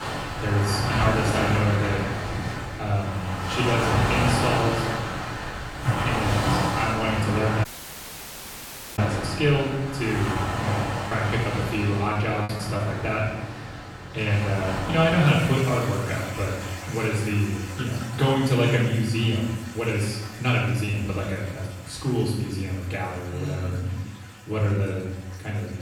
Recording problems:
off-mic speech; far
room echo; noticeable; dies away in 0.9 s
rain or running water; loud; throughout; 4 dB below the speech
audio cutting out; at 7.5 s for 1.5 s
choppy; very; from 10 to 13 s and at 21 s; 6% of the speech affected

